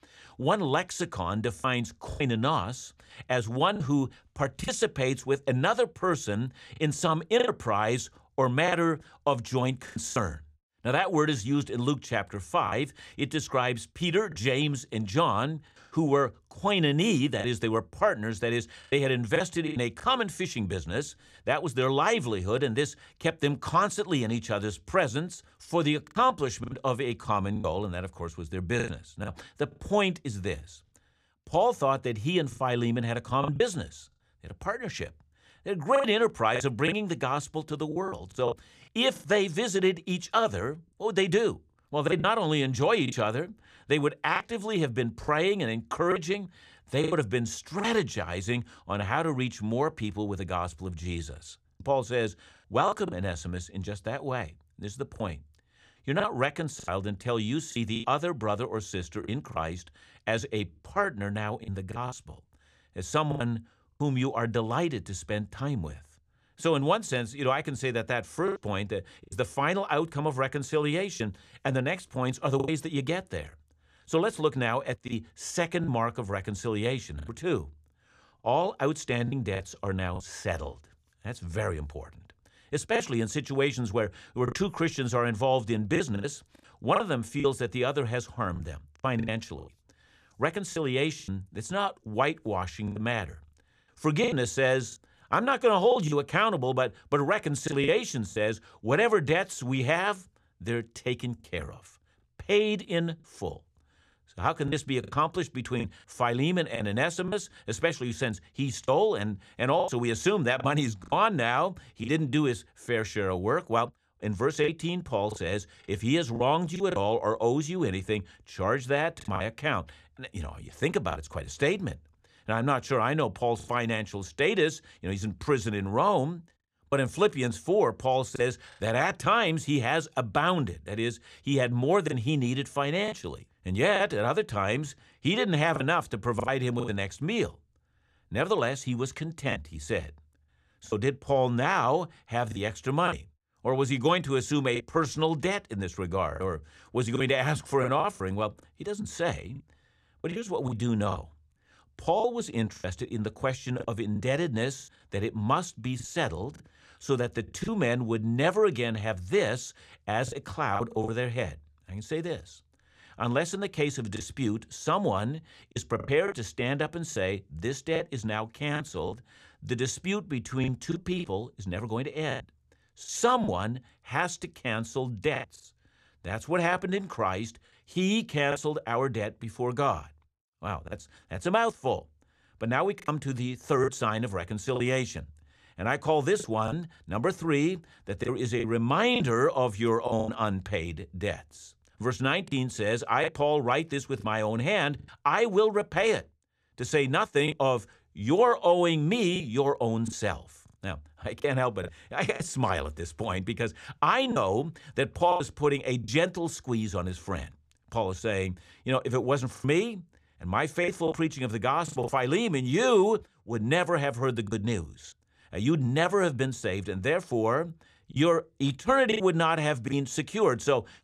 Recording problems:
choppy; very; 5% of the speech affected

